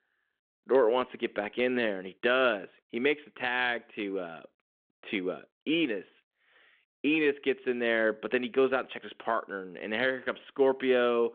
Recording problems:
phone-call audio

